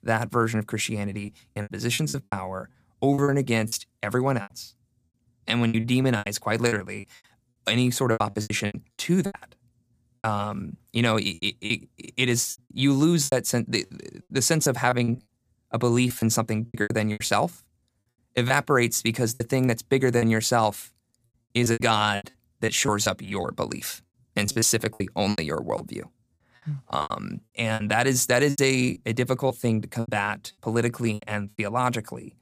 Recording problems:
choppy; very; 13% of the speech affected

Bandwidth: 15 kHz